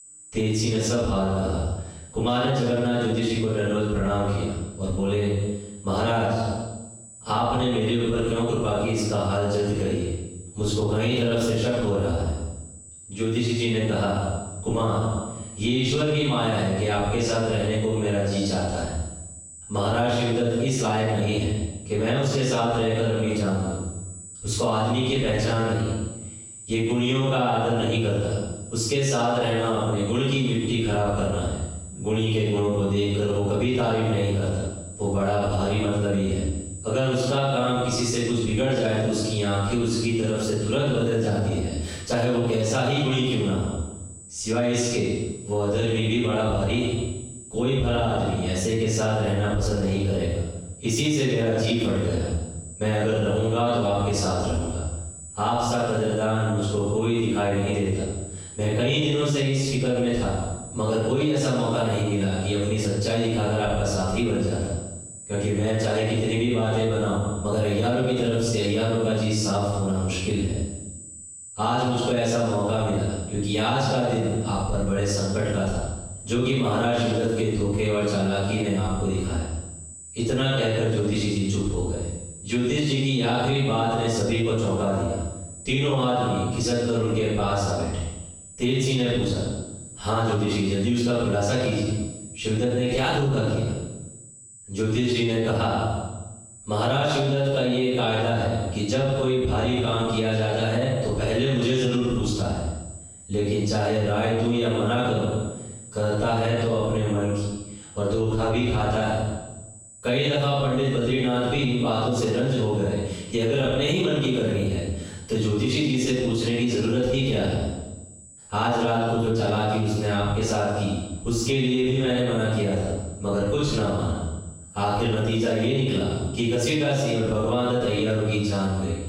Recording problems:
room echo; strong; dies away in 0.9 s
off-mic speech; far
squashed, flat; heavily
high-pitched whine; noticeable; throughout; 8 kHz, 20 dB below the speech

